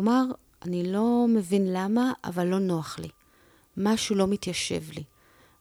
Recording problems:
abrupt cut into speech; at the start

